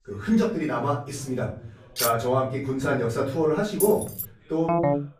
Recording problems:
off-mic speech; far
room echo; slight; dies away in 0.5 s
background chatter; faint; throughout; 2 voices, 30 dB below the speech
clattering dishes; noticeable; at 2 s; peak 2 dB below the speech
jangling keys; noticeable; at 4 s; peak 5 dB below the speech
phone ringing; loud; at 4.5 s; peak 2 dB above the speech

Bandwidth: 15 kHz